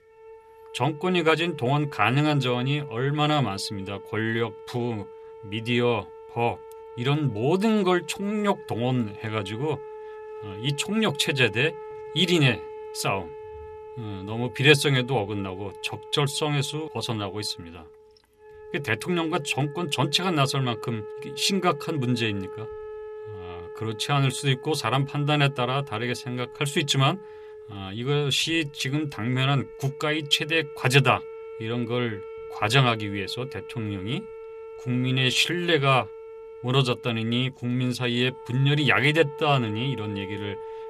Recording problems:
background music; noticeable; throughout; 15 dB below the speech

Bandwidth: 14.5 kHz